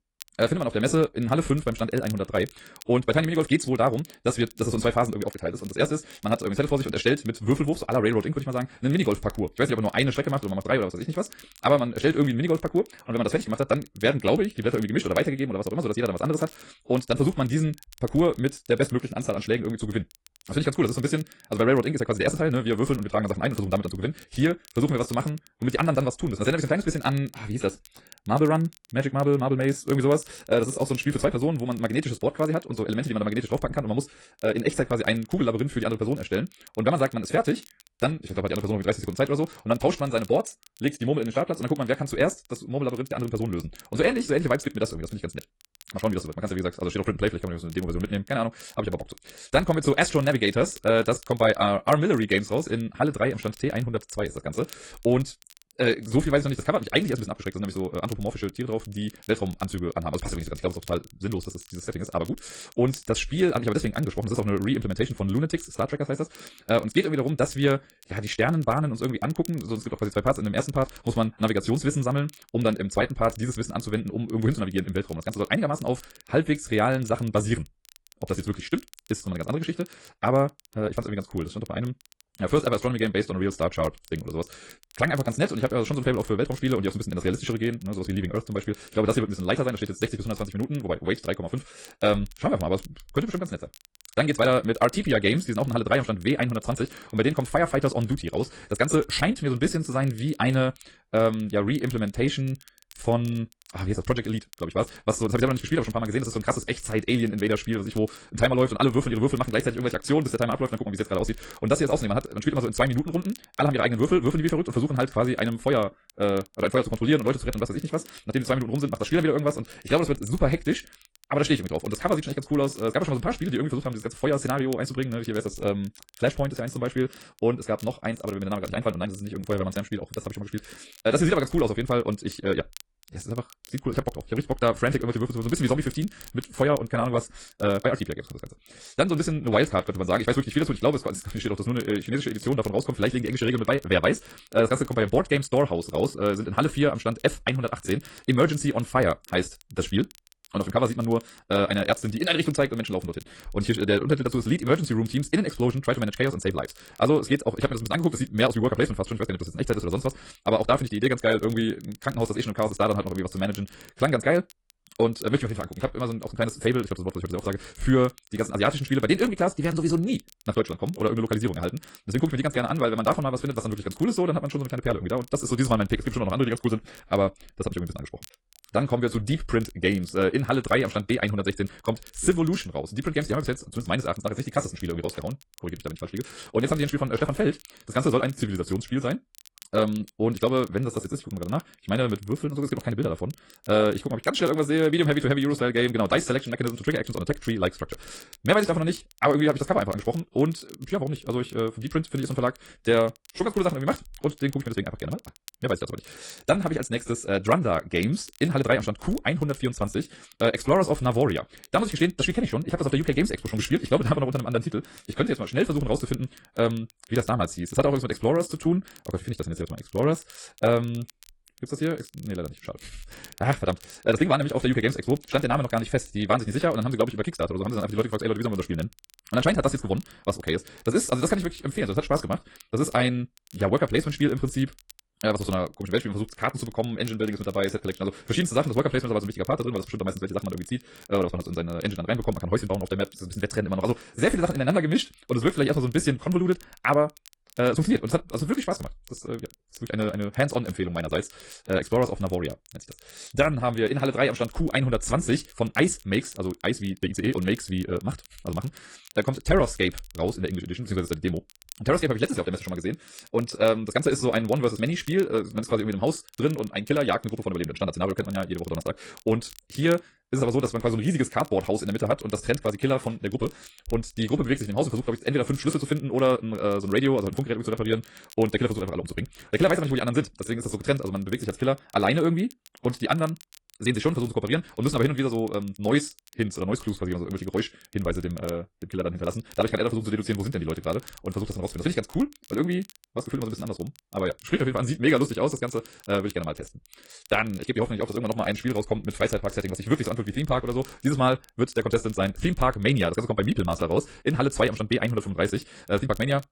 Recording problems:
wrong speed, natural pitch; too fast; 1.7 times normal speed
garbled, watery; slightly
crackle, like an old record; faint; 25 dB below the speech

